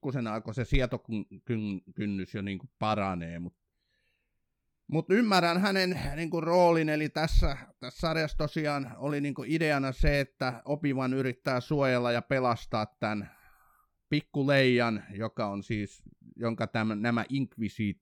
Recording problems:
none

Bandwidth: 18 kHz